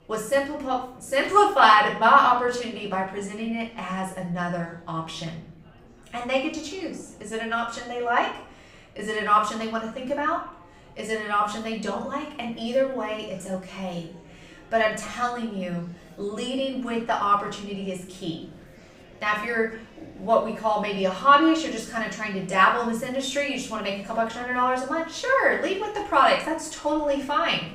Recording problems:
off-mic speech; far
room echo; slight; dies away in 0.5 s
murmuring crowd; faint; throughout; 25 dB below the speech

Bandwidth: 15.5 kHz